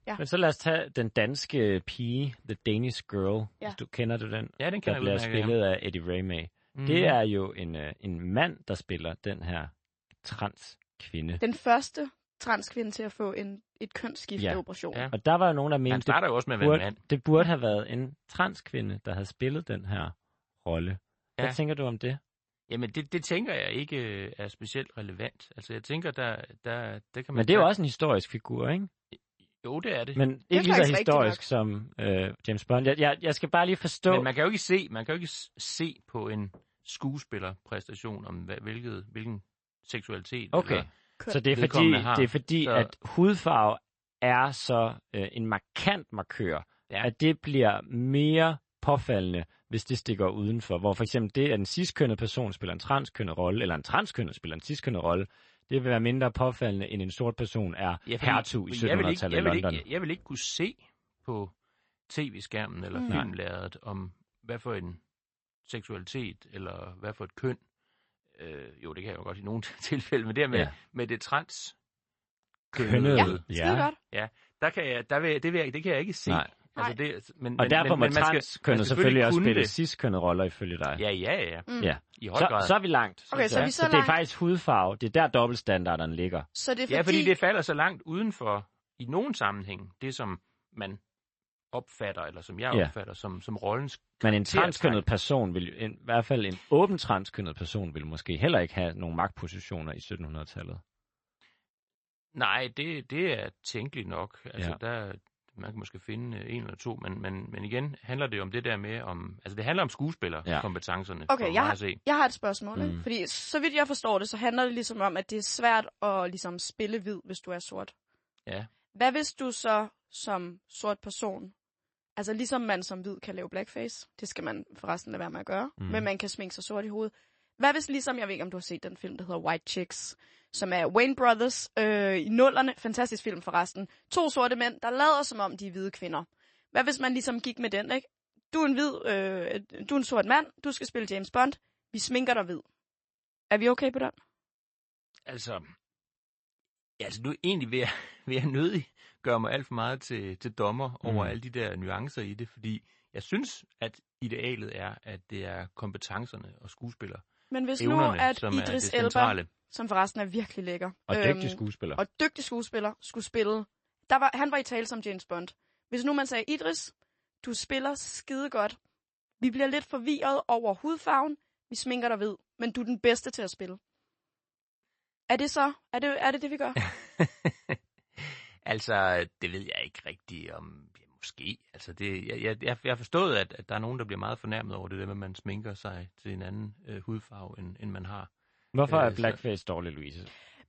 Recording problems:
garbled, watery; slightly; nothing above 8 kHz

